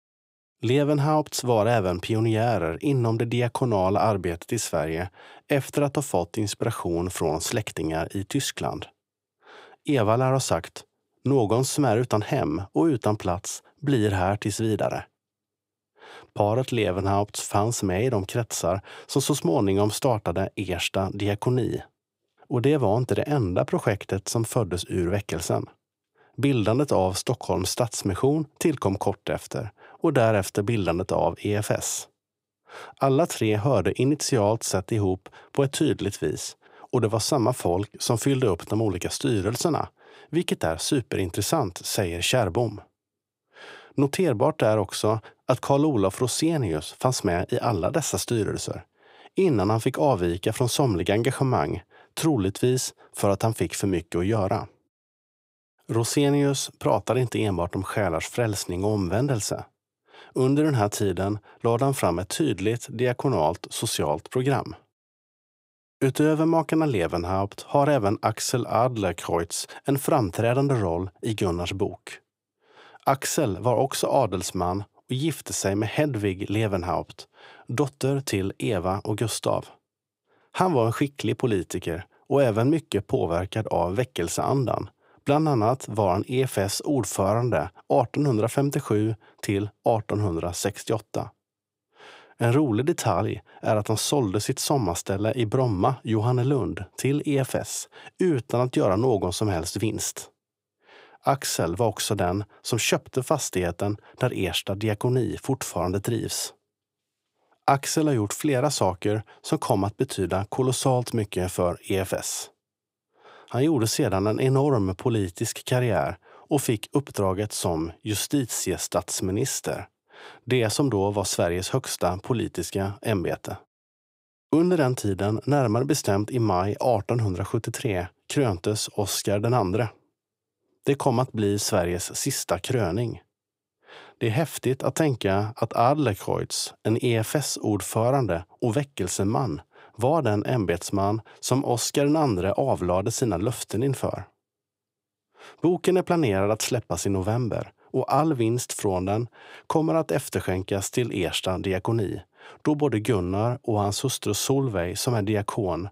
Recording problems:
none

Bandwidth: 15.5 kHz